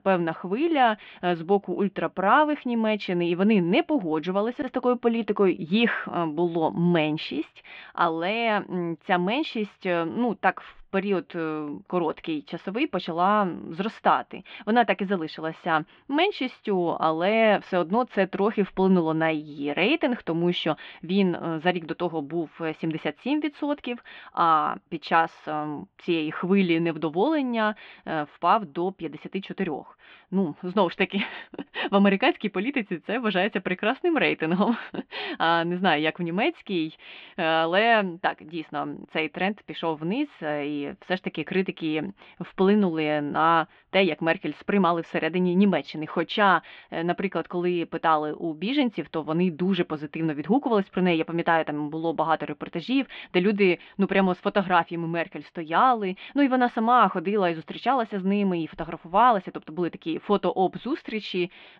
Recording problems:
muffled; very; fading above 3 kHz

